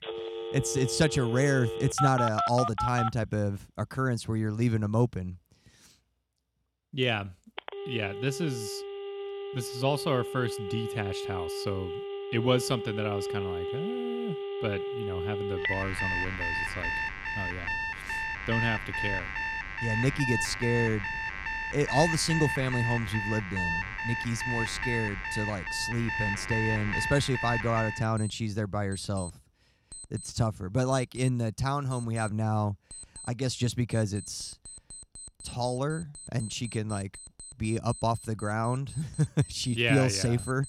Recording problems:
alarms or sirens; loud; throughout; 3 dB below the speech

